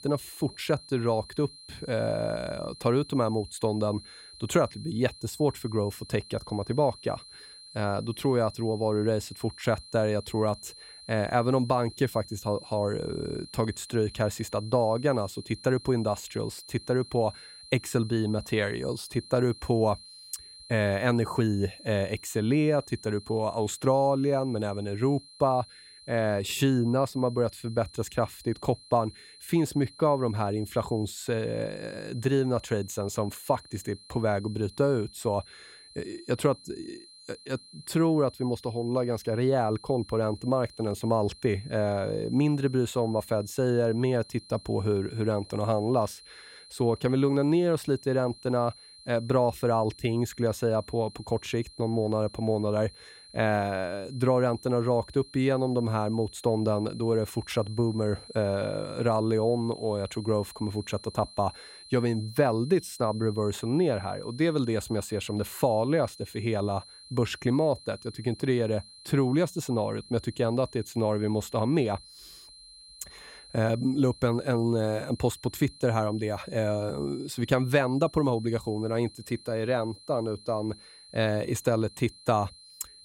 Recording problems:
high-pitched whine; noticeable; throughout; 4 kHz, 20 dB below the speech

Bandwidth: 16 kHz